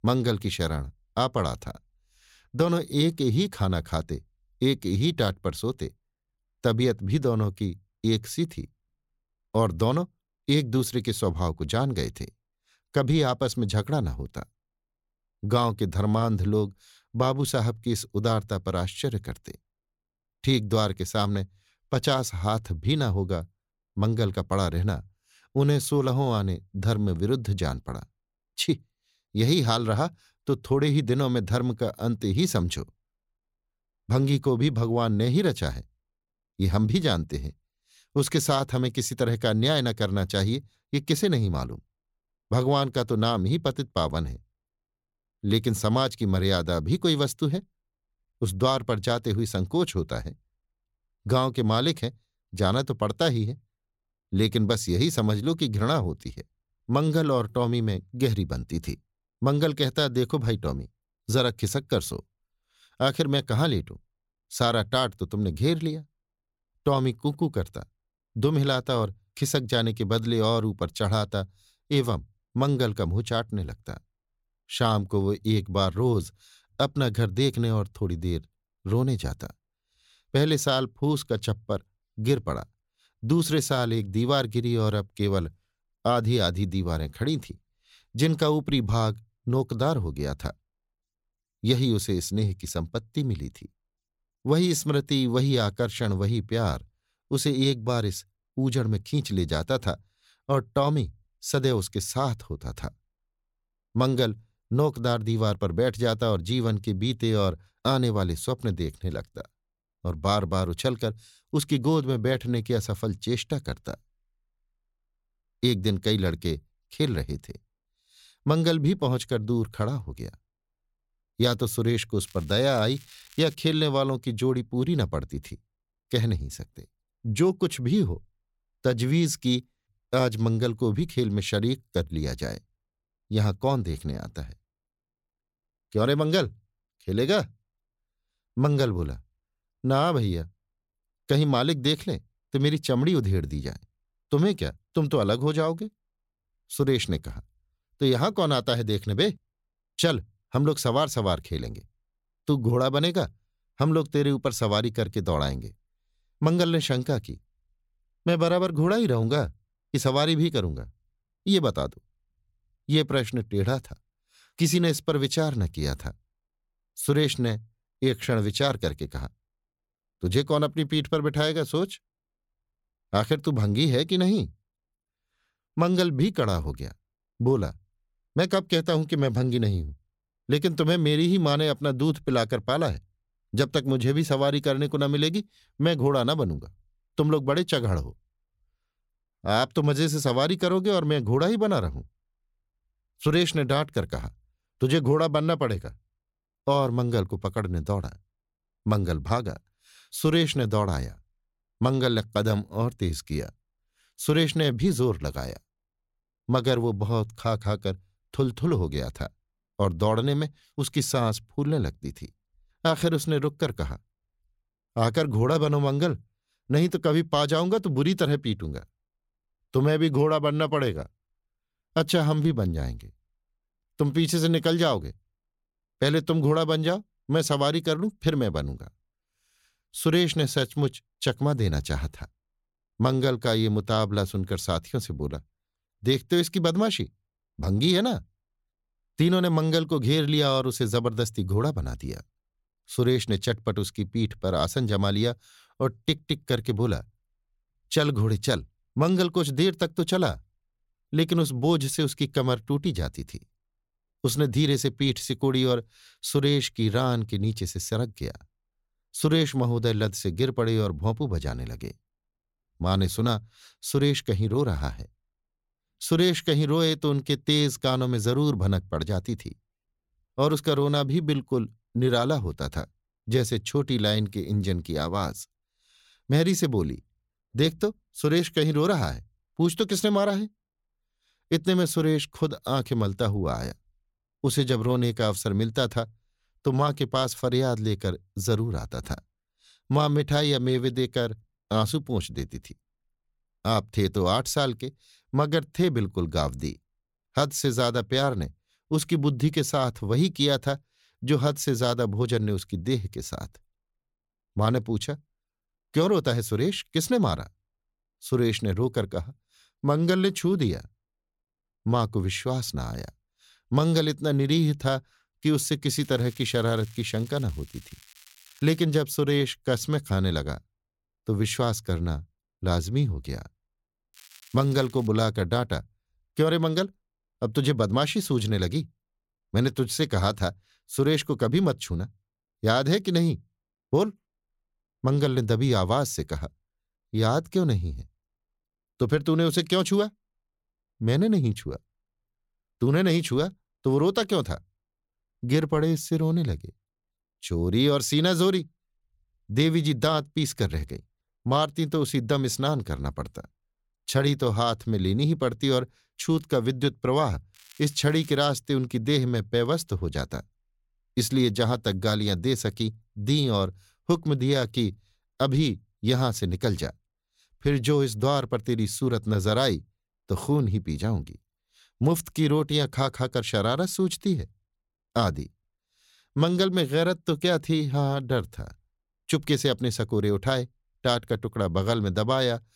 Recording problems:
crackling; faint; 4 times, first at 2:02; 25 dB below the speech

